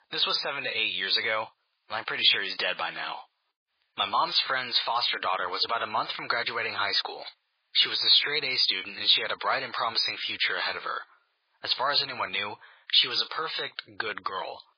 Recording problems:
garbled, watery; badly; nothing above 5 kHz
thin; very; fading below 1 kHz

